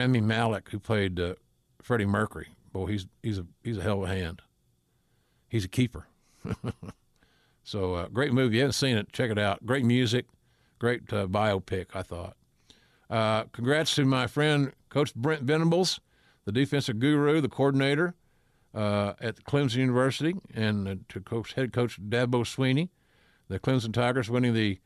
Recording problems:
abrupt cut into speech; at the start

